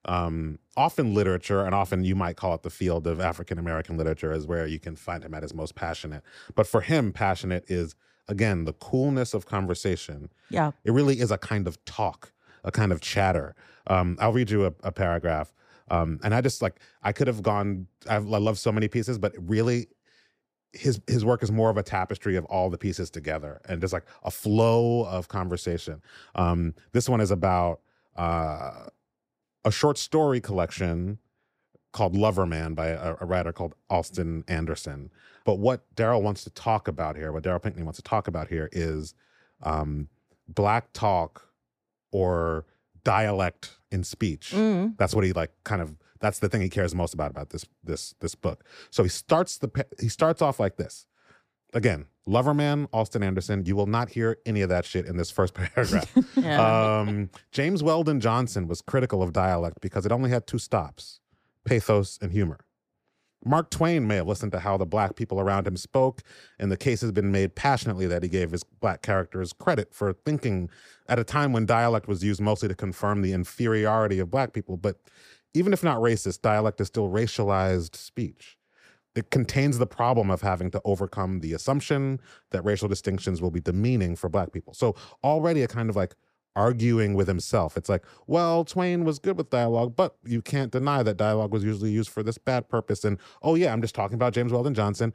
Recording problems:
none

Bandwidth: 15 kHz